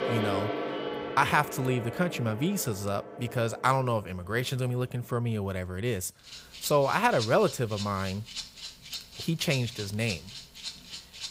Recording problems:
background music; loud; throughout; 9 dB below the speech

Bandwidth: 15.5 kHz